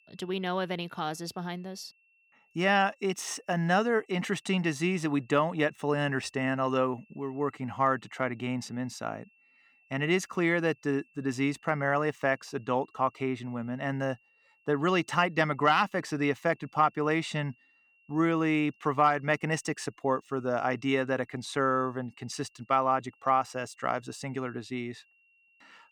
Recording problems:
high-pitched whine; faint; throughout; 2.5 kHz, 35 dB below the speech

